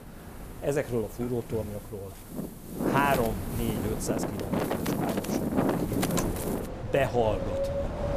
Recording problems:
wind in the background; very loud; throughout; 1 dB above the speech

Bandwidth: 15 kHz